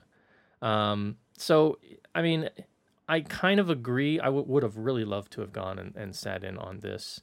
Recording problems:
none

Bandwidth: 16 kHz